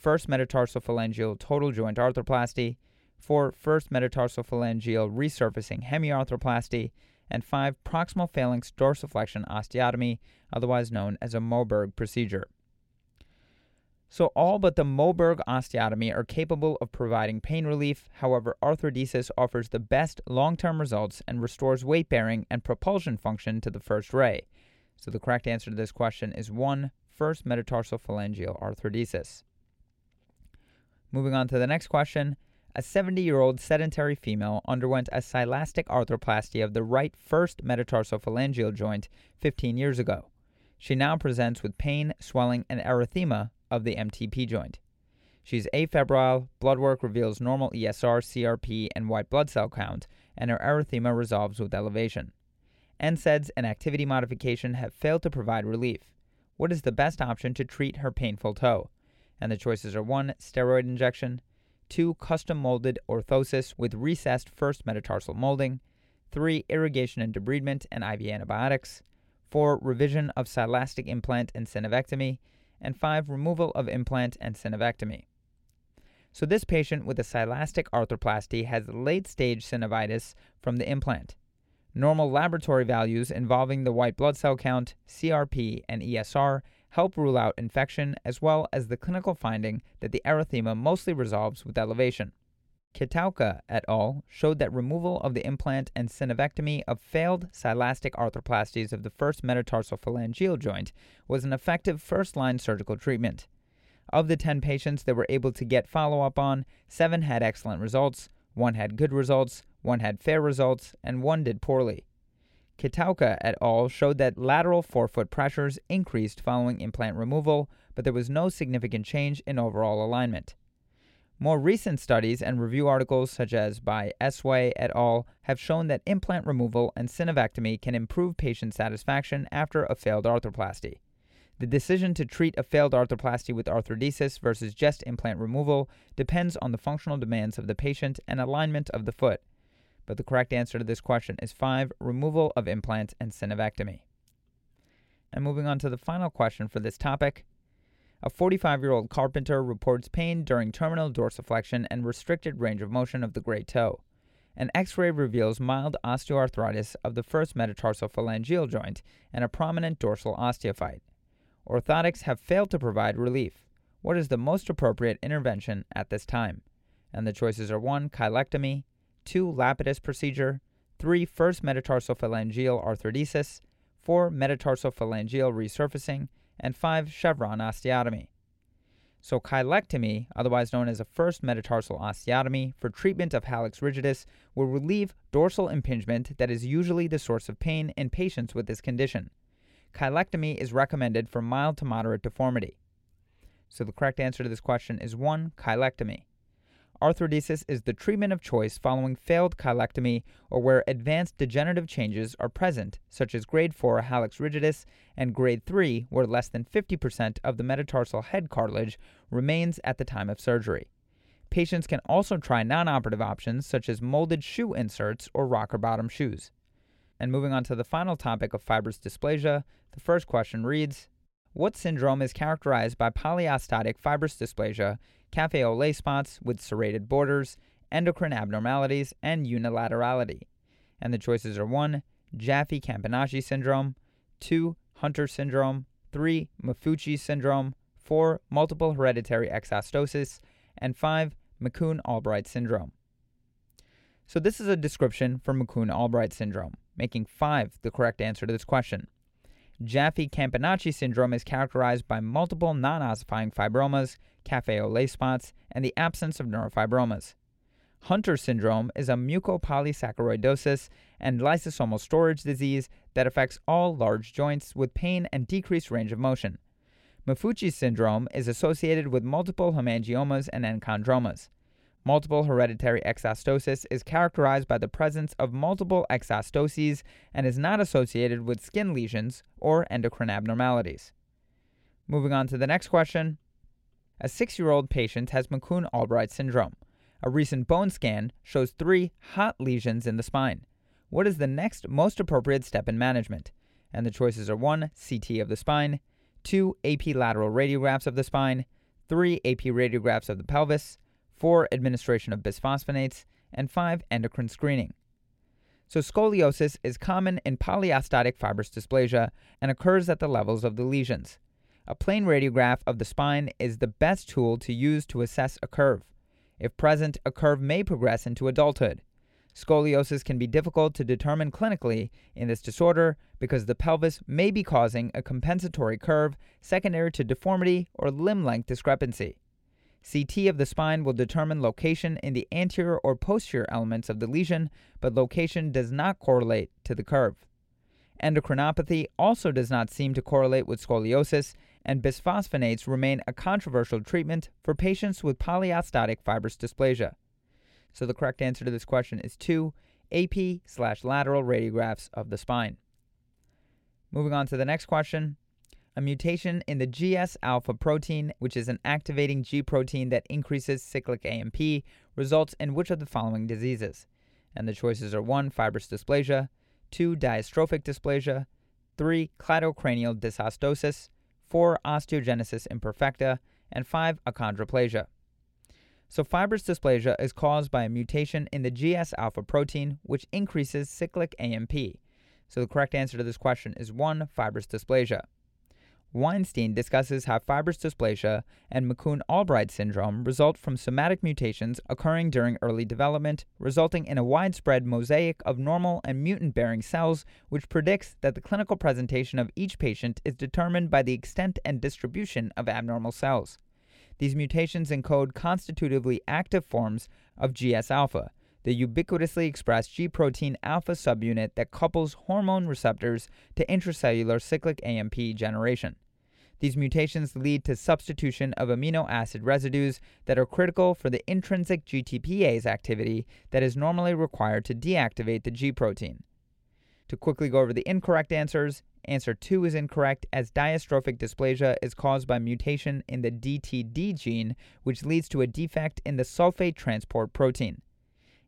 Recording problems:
none

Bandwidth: 16.5 kHz